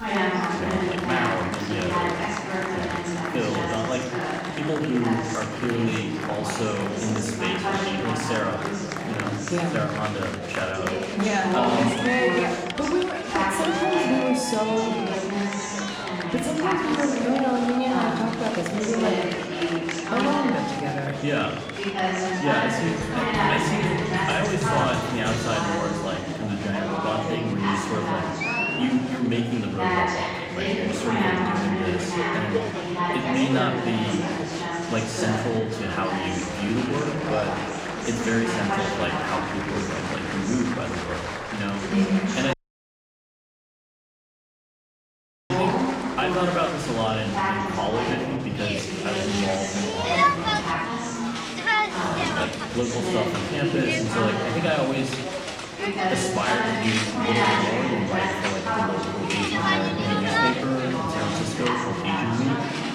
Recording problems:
off-mic speech; far
room echo; noticeable; dies away in 0.8 s
murmuring crowd; very loud; throughout; 1 dB above the speech
audio cutting out; at 43 s for 3 s

